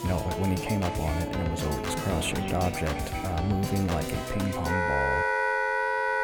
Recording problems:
echo of what is said; noticeable; throughout; 190 ms later, 15 dB below the speech
background music; very loud; throughout; 1 dB above the speech
high-pitched whine; faint; throughout; 3.5 kHz, 30 dB below the speech

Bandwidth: 18.5 kHz